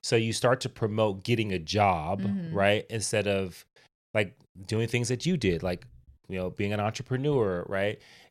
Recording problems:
none

